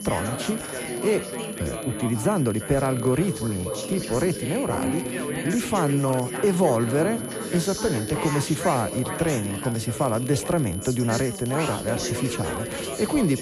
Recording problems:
background chatter; loud; throughout; 4 voices, 6 dB below the speech
high-pitched whine; noticeable; throughout; 10 kHz, 10 dB below the speech
crackle, like an old record; faint; 25 dB below the speech

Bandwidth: 14.5 kHz